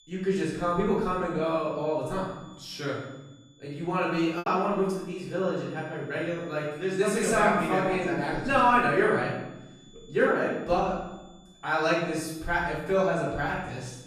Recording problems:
off-mic speech; far
room echo; noticeable; dies away in 0.9 s
high-pitched whine; faint; throughout; 3.5 kHz, 30 dB below the speech
choppy; occasionally; 1% of the speech affected

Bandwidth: 14 kHz